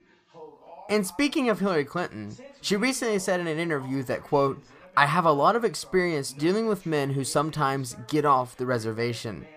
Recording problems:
voice in the background; faint; throughout; 25 dB below the speech

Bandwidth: 15 kHz